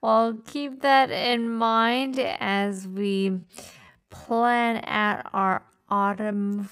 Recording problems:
wrong speed, natural pitch; too slow; 0.5 times normal speed

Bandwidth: 15.5 kHz